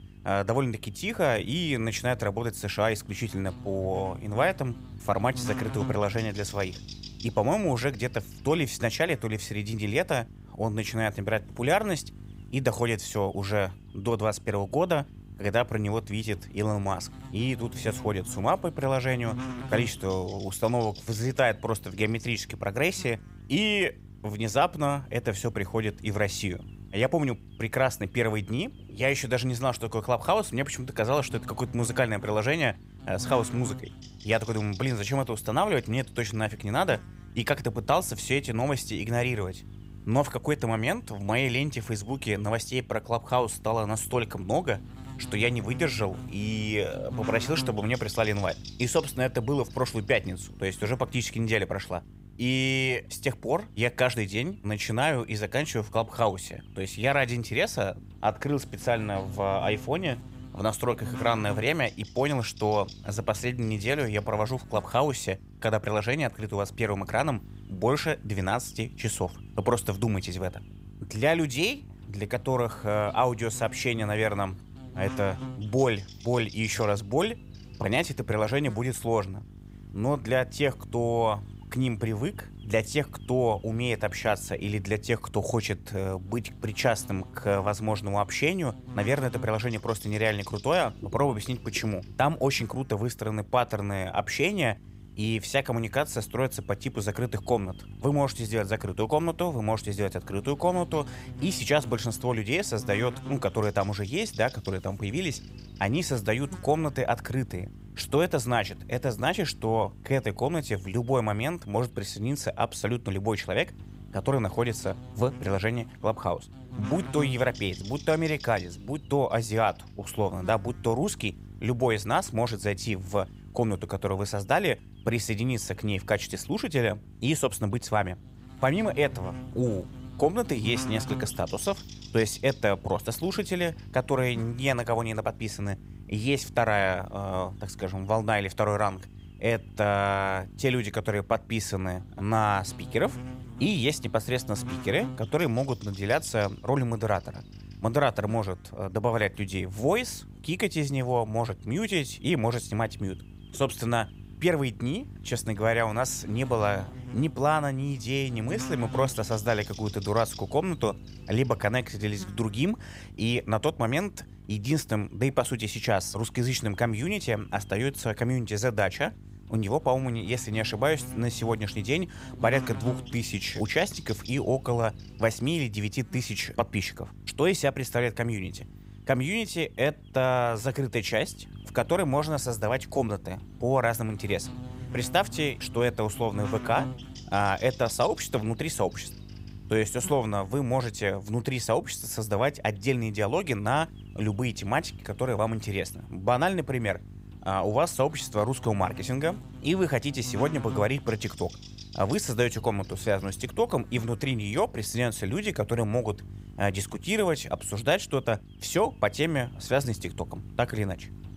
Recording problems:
electrical hum; faint; throughout; 50 Hz, 20 dB below the speech

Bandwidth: 15.5 kHz